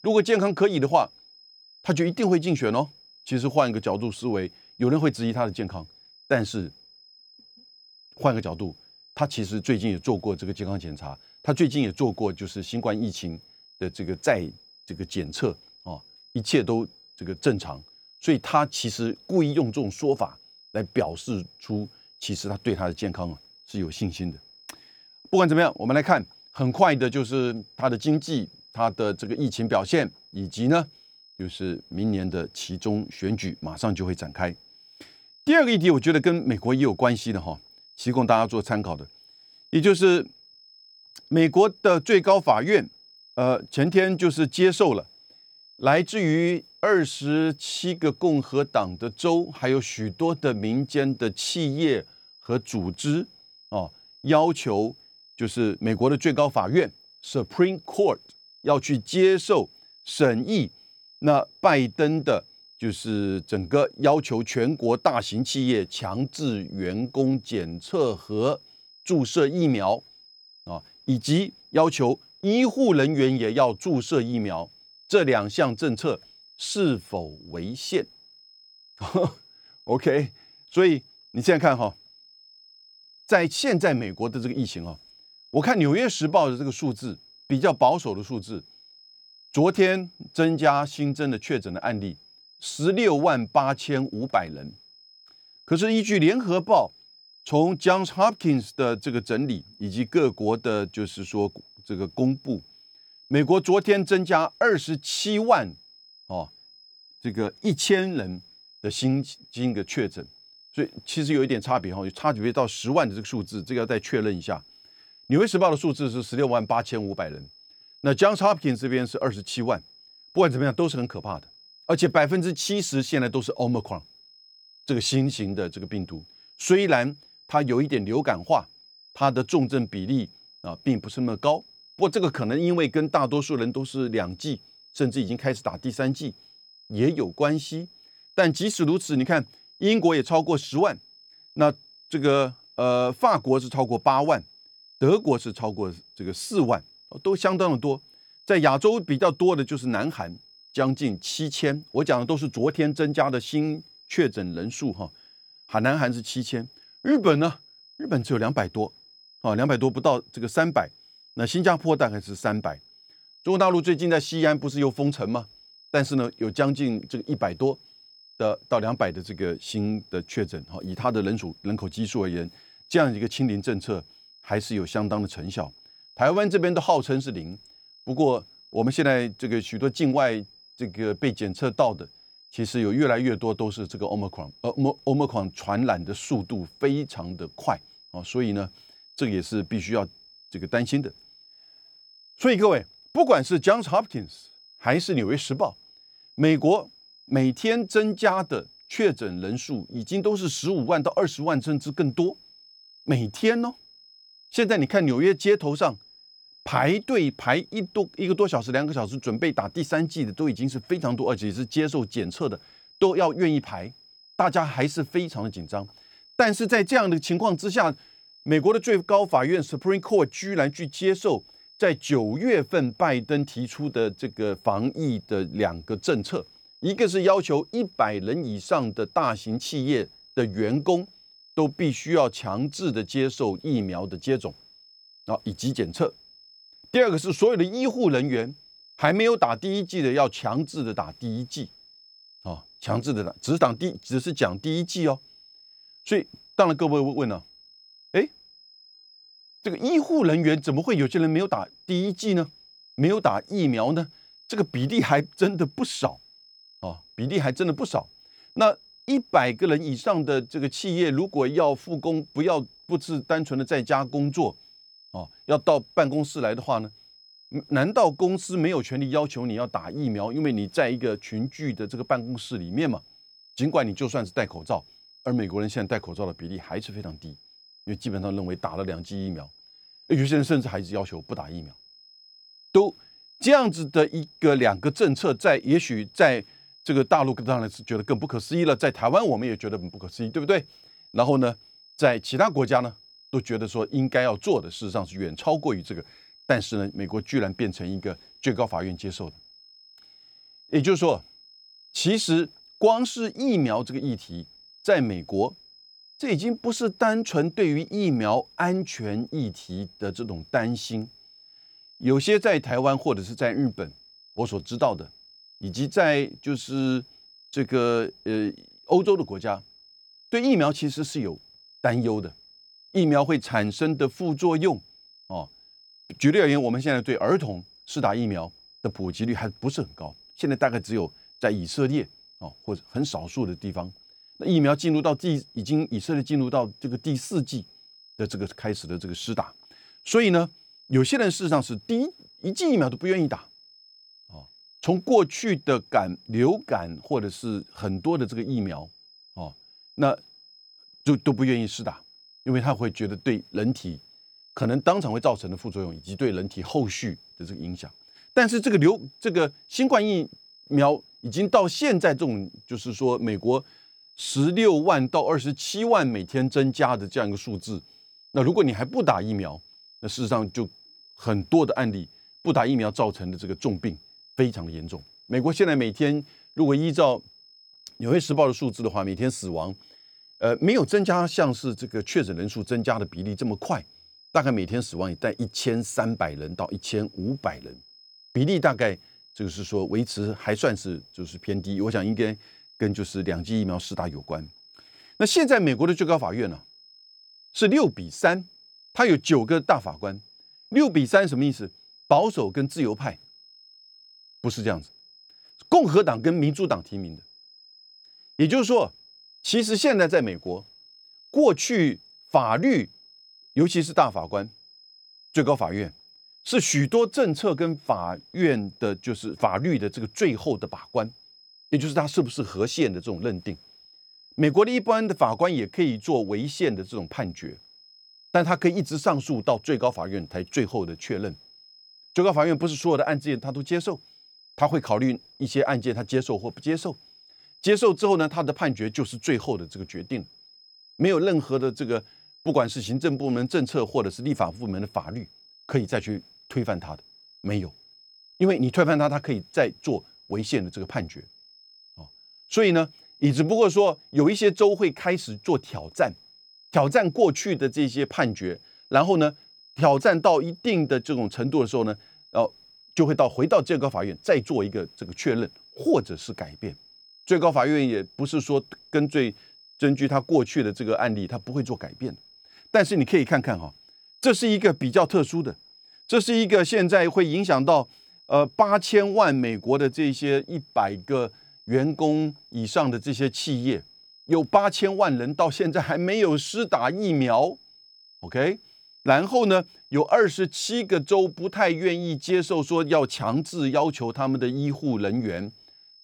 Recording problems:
high-pitched whine; faint; throughout; 5 kHz, 25 dB below the speech

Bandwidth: 18.5 kHz